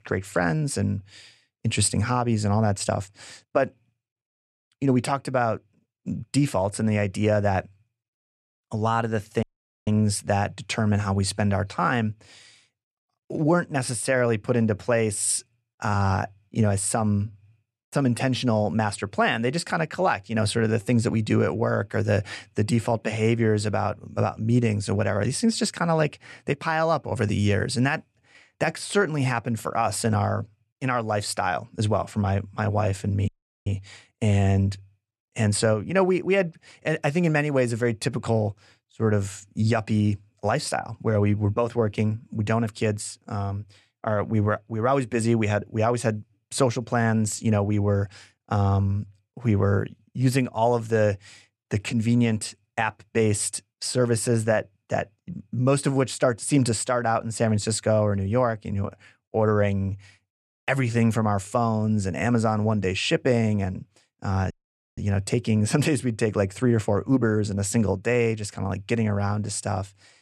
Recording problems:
audio cutting out; at 9.5 s, at 33 s and at 1:05

